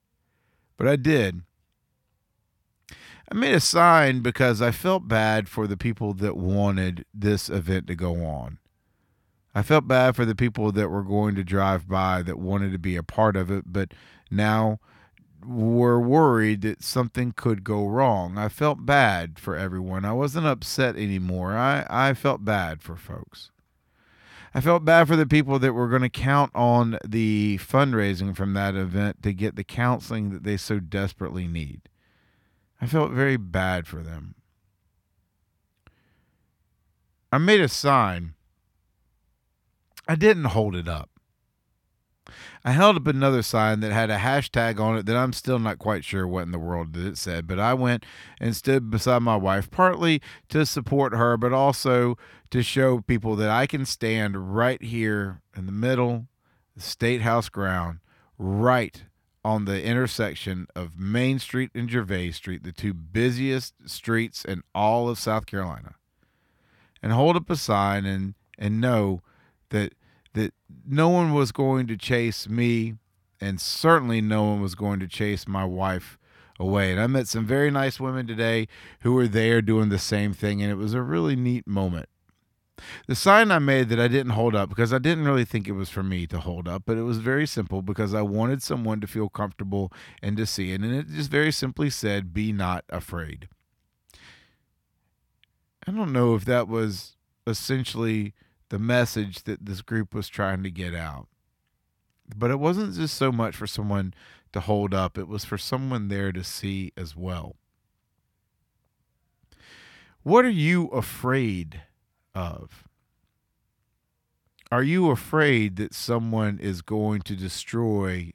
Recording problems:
none

